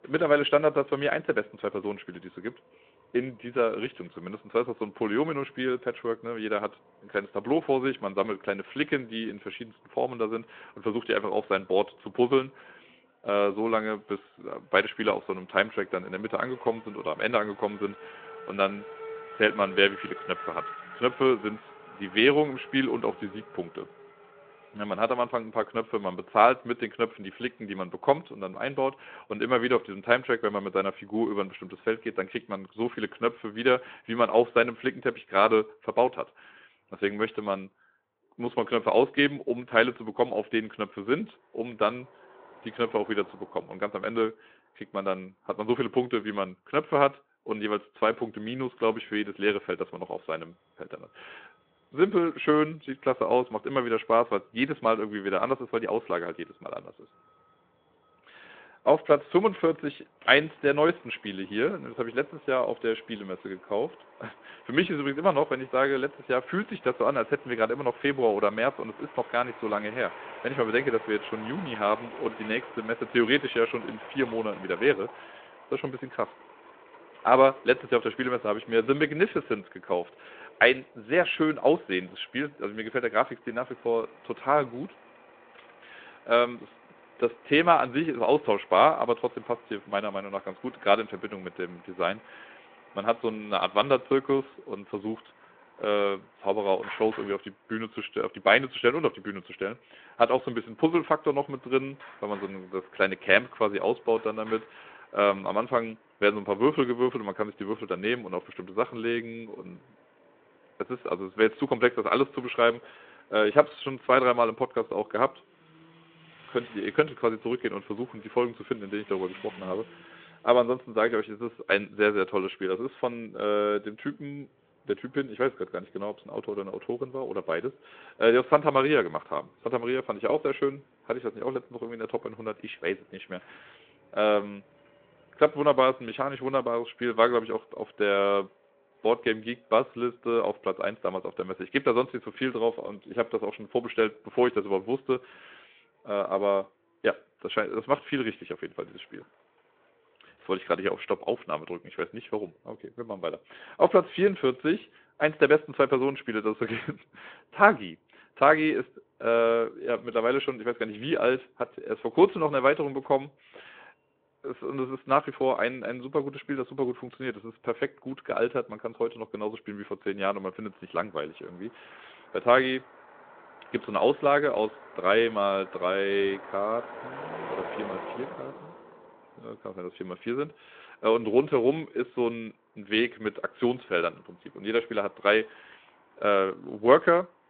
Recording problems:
phone-call audio
traffic noise; faint; throughout; 20 dB below the speech

